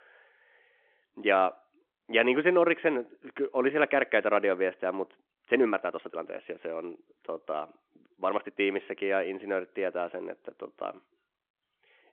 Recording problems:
phone-call audio
uneven, jittery; strongly; from 3.5 to 8.5 s

